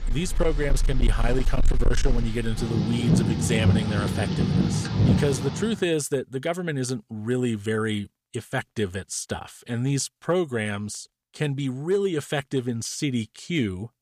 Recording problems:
distortion; slight; 5% of the sound clipped
rain or running water; very loud; until 5.5 s; 2 dB above the speech

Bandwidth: 15 kHz